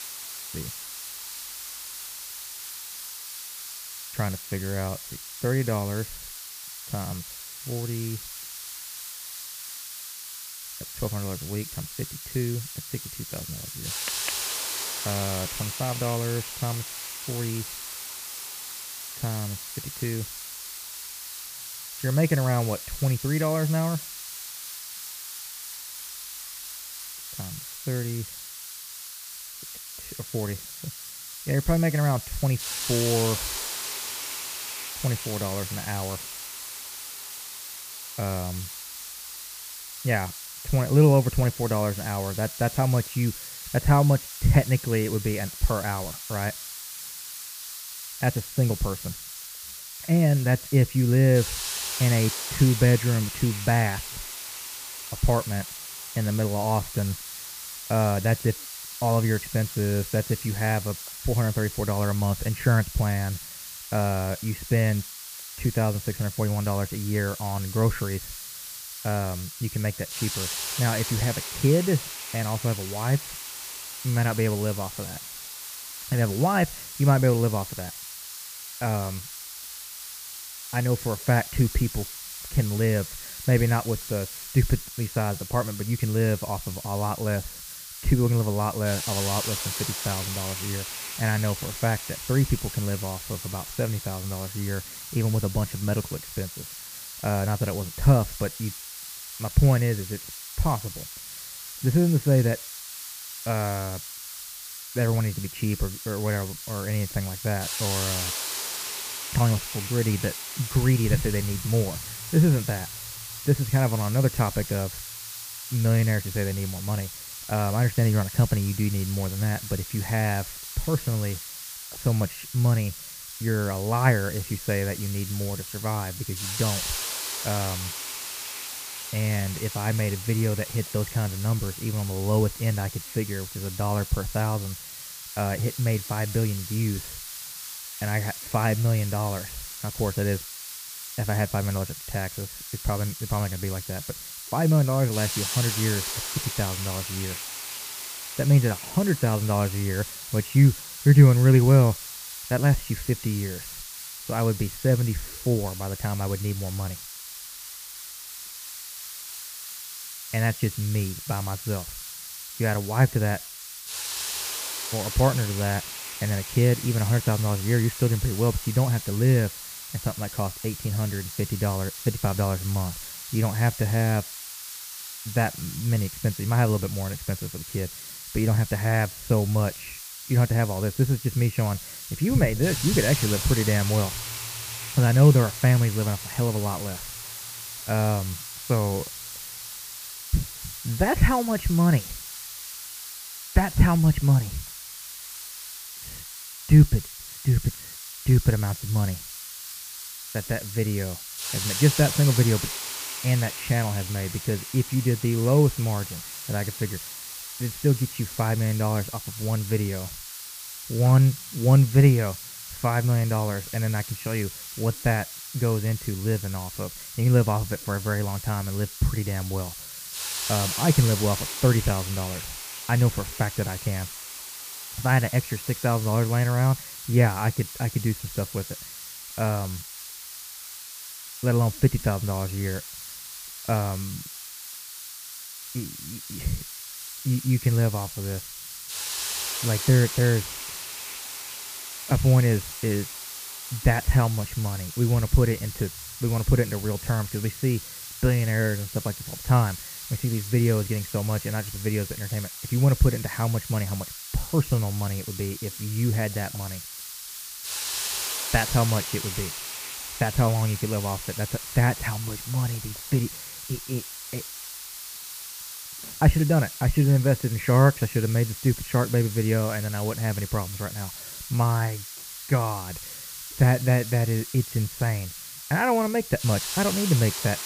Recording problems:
high frequencies cut off; severe; nothing above 3 kHz
muffled; very slightly; fading above 2.5 kHz
hiss; loud; throughout; 9 dB below the speech

